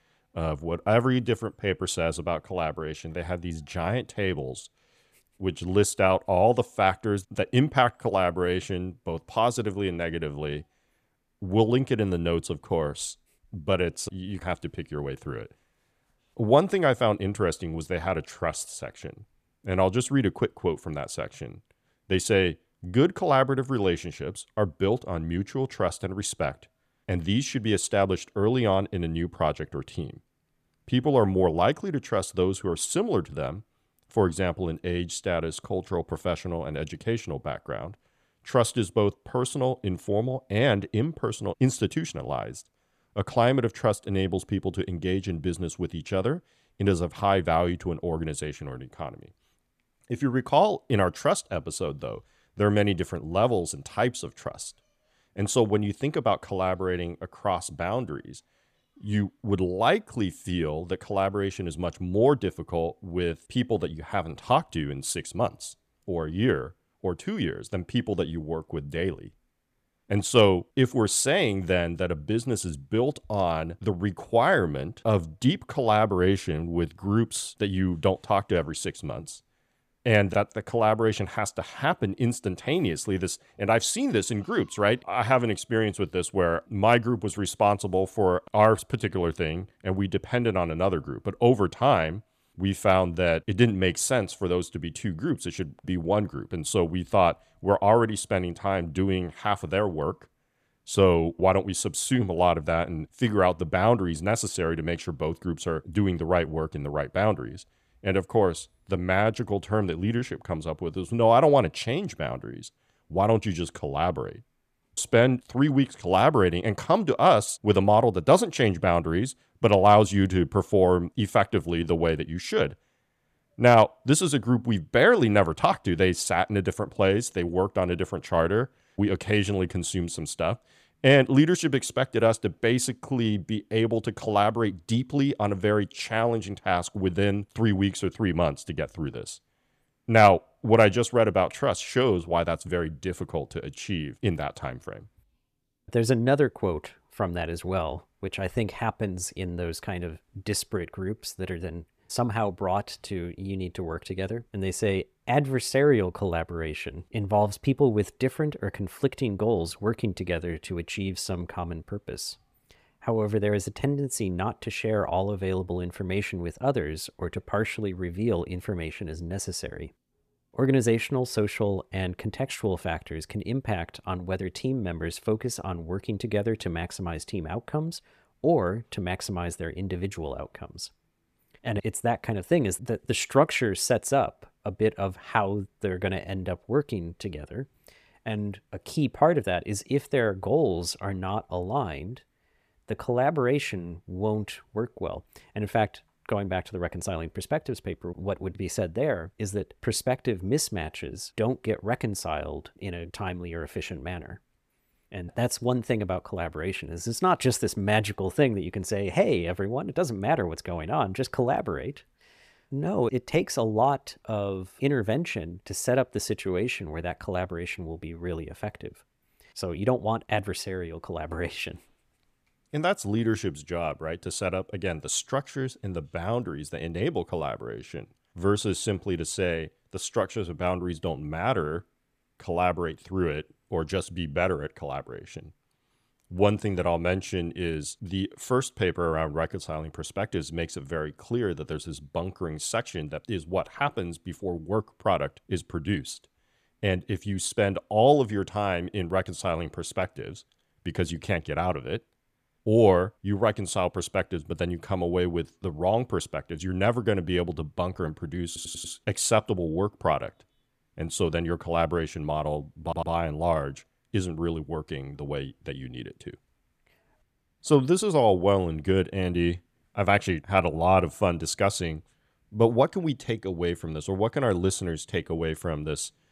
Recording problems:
audio stuttering; at 4:18 and at 4:23

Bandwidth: 14.5 kHz